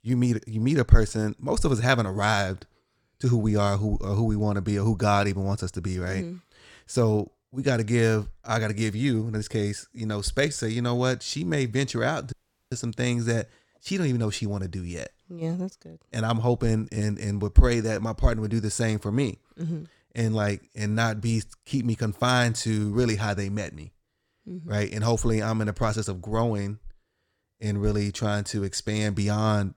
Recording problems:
audio cutting out; at 12 s

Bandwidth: 17 kHz